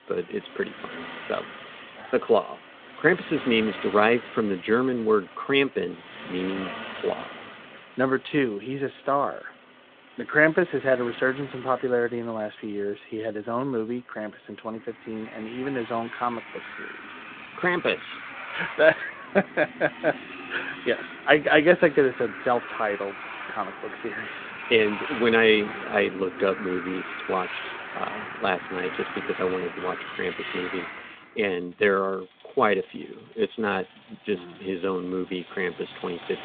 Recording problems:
phone-call audio; nothing above 3.5 kHz
traffic noise; noticeable; throughout; 10 dB below the speech

